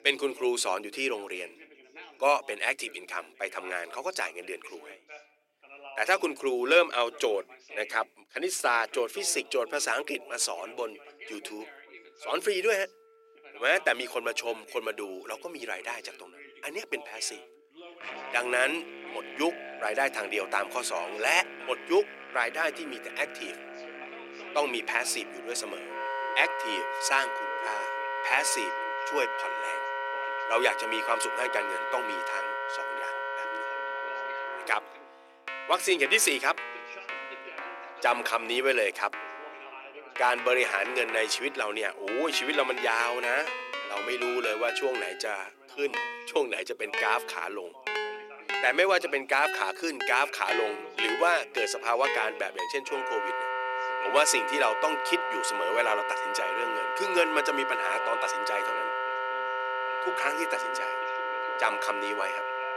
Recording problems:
thin; very; fading below 400 Hz
background music; loud; throughout; 5 dB below the speech
background chatter; noticeable; throughout; 2 voices, 20 dB below the speech

